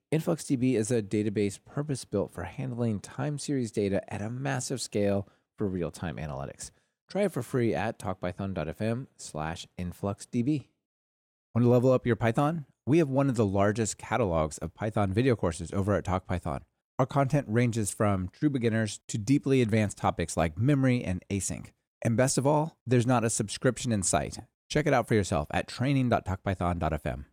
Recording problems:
none

